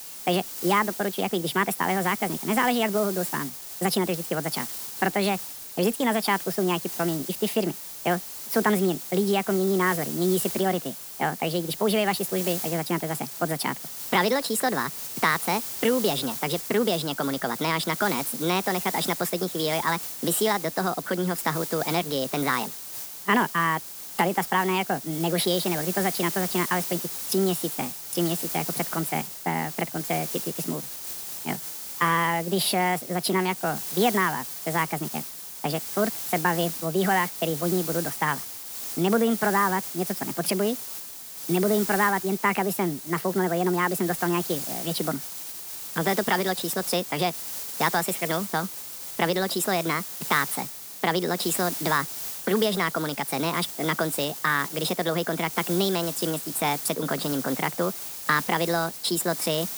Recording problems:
wrong speed and pitch; too fast and too high; 1.5 times normal speed
hiss; loud; throughout; 6 dB below the speech

